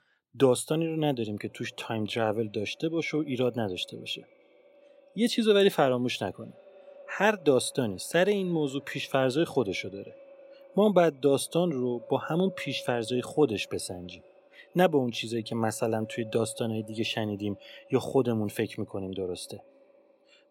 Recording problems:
echo of what is said; faint; throughout; 320 ms later, 25 dB below the speech

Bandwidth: 16.5 kHz